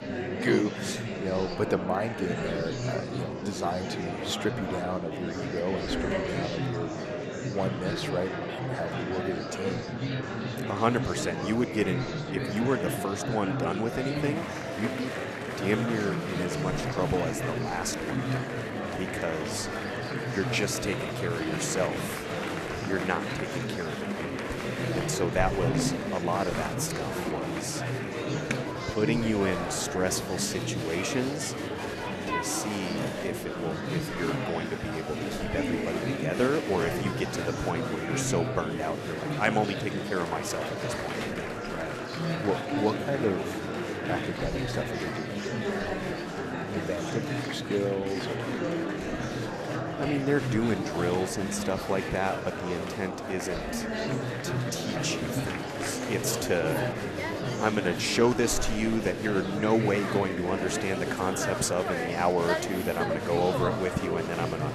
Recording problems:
murmuring crowd; loud; throughout; 1 dB below the speech

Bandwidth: 13.5 kHz